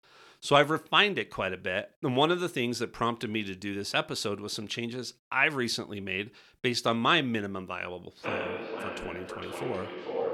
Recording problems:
echo of what is said; strong; from 8 s on; 450 ms later, 8 dB below the speech

